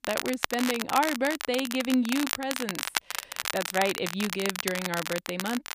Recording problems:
crackle, like an old record; loud; 3 dB below the speech

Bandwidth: 15 kHz